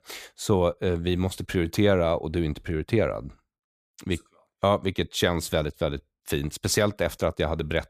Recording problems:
none

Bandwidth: 15 kHz